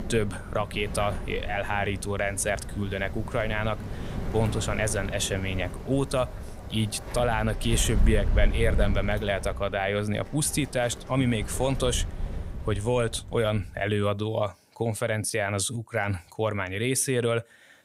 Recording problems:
wind in the background; loud; until 13 s; 7 dB below the speech

